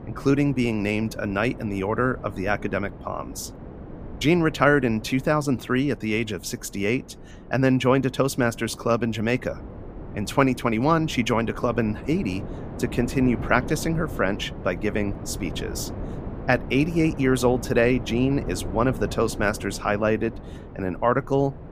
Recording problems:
wind noise on the microphone; occasional gusts; 15 dB below the speech

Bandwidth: 15 kHz